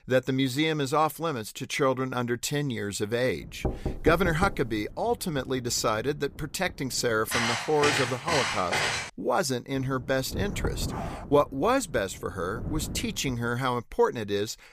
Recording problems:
wind noise on the microphone; occasional gusts; from 3.5 to 7.5 s and from 10 to 13 s; 20 dB below the speech
door banging; noticeable; from 3.5 to 5 s; peak 5 dB below the speech
footsteps; loud; from 7.5 to 9 s; peak 2 dB above the speech
dog barking; faint; at 11 s; peak 10 dB below the speech

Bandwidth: 15 kHz